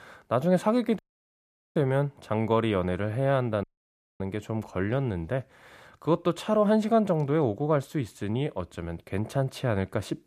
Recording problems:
audio cutting out; at 1 s for 1 s and at 3.5 s for 0.5 s

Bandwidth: 14.5 kHz